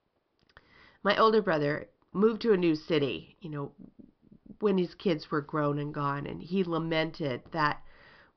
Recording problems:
high frequencies cut off; noticeable; nothing above 5.5 kHz

